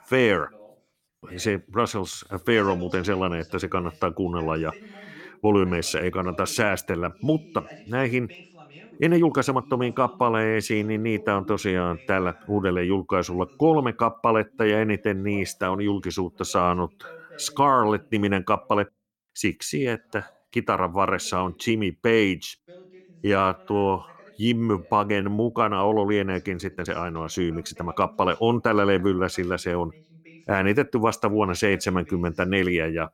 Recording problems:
voice in the background; faint; throughout; 25 dB below the speech
uneven, jittery; strongly; from 5.5 to 28 s

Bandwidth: 17 kHz